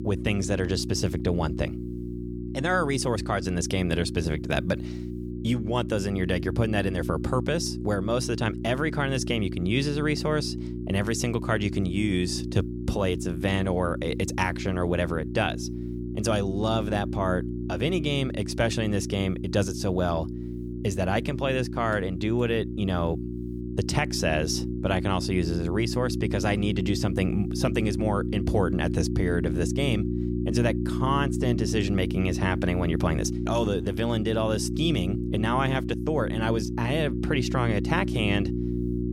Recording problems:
electrical hum; loud; throughout; 60 Hz, 8 dB below the speech

